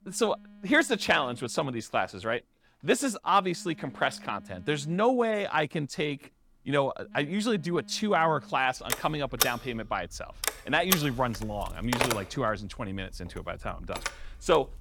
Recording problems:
alarms or sirens; loud; throughout; 3 dB below the speech

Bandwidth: 18 kHz